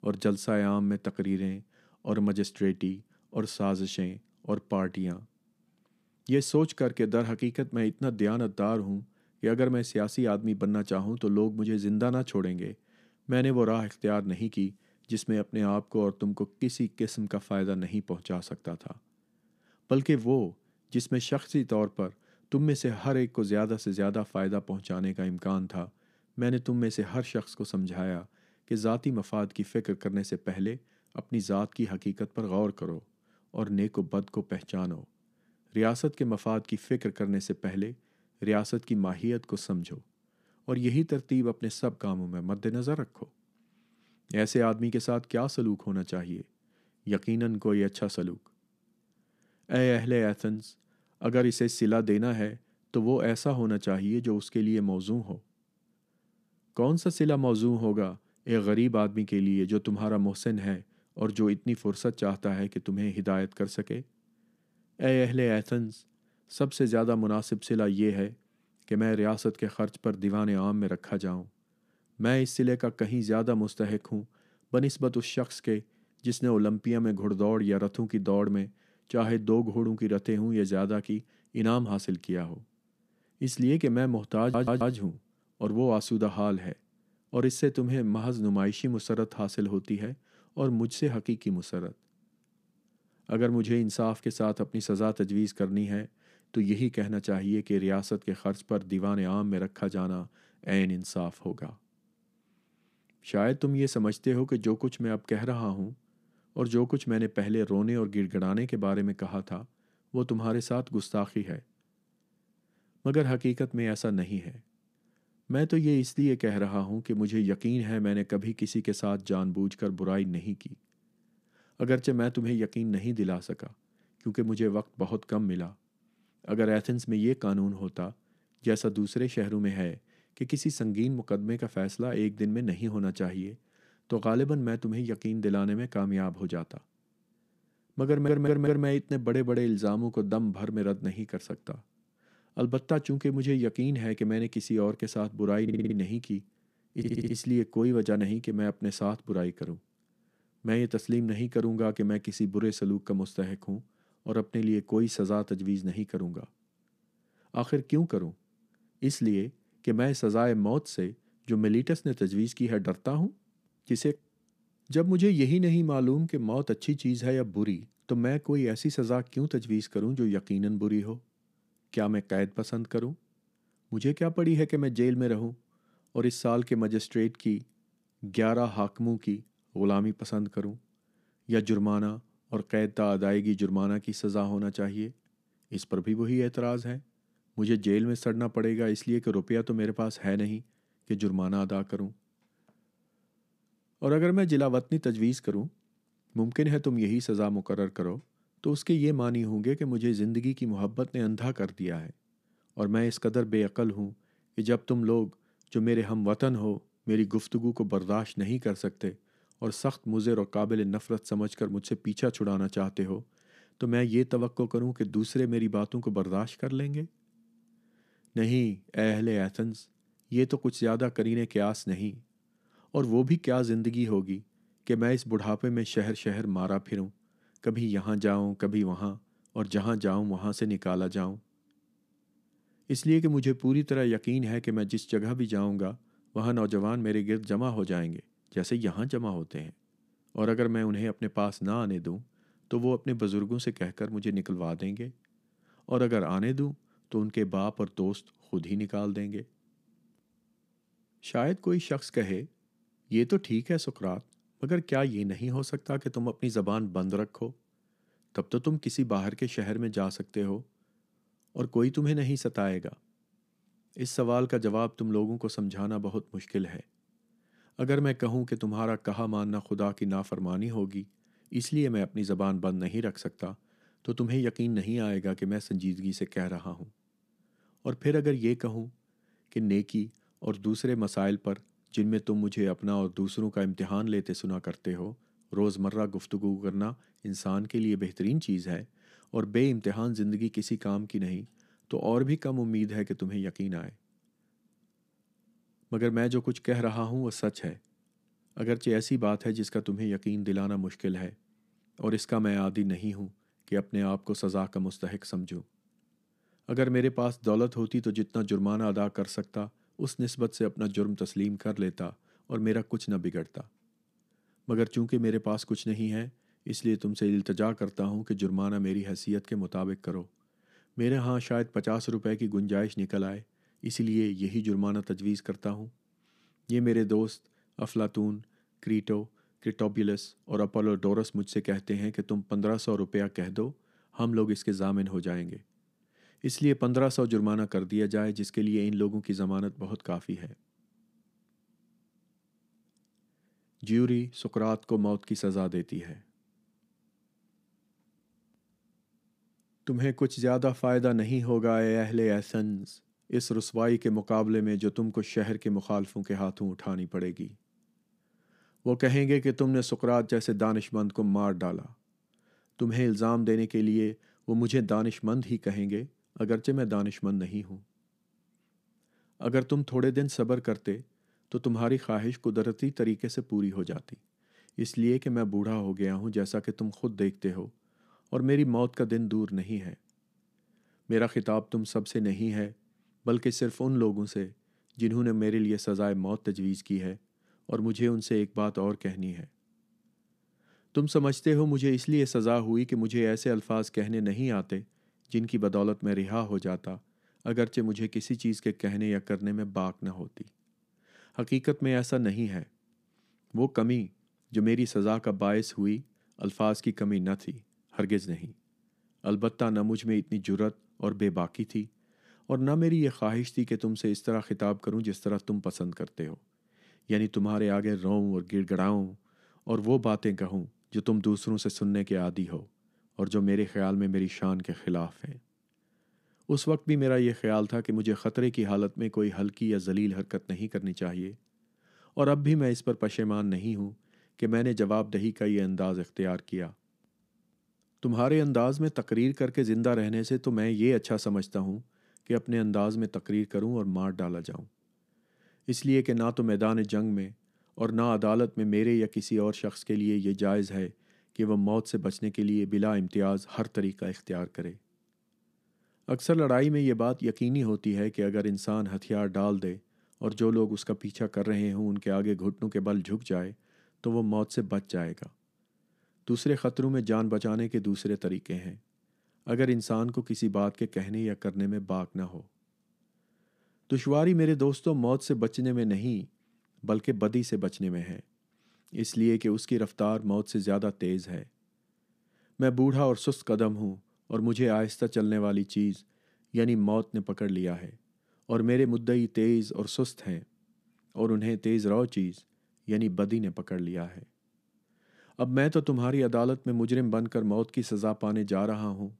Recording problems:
audio stuttering; 4 times, first at 1:24

